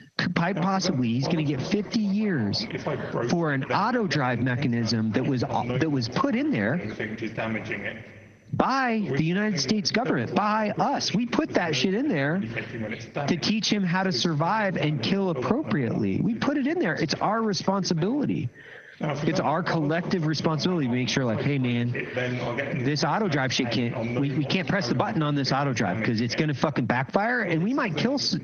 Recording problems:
squashed, flat; heavily, background pumping
garbled, watery; slightly; nothing above 6.5 kHz
voice in the background; loud; throughout; 9 dB below the speech

